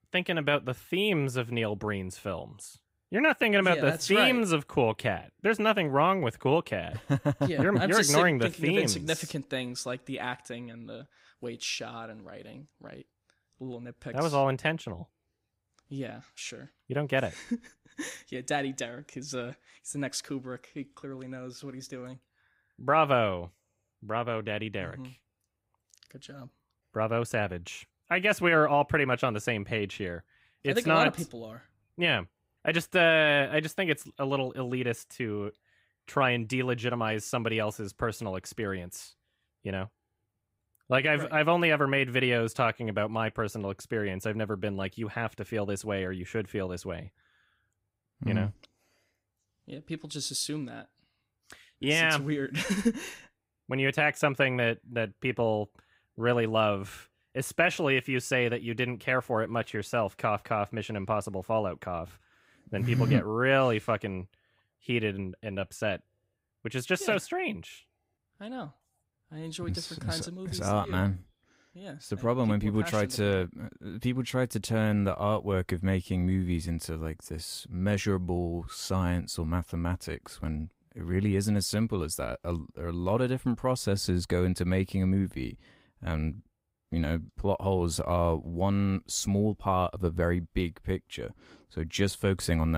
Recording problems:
abrupt cut into speech; at the end

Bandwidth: 15.5 kHz